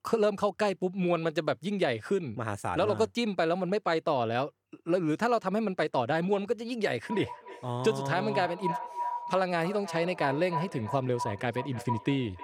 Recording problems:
echo of what is said; strong; from 7 s on; 310 ms later, 9 dB below the speech

